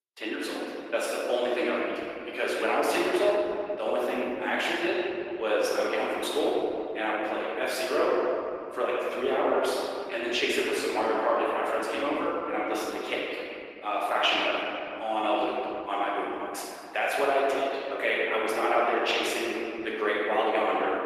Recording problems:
room echo; strong; dies away in 3 s
off-mic speech; far
thin; somewhat; fading below 350 Hz
garbled, watery; slightly; nothing above 14.5 kHz

